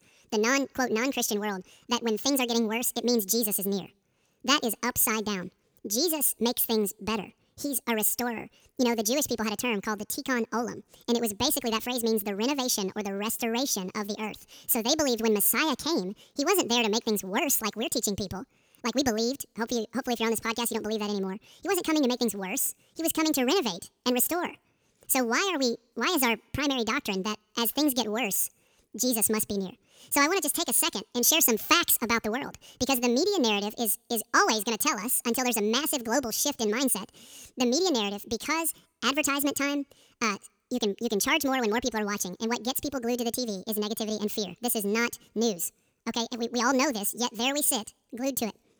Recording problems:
wrong speed and pitch; too fast and too high; 1.7 times normal speed

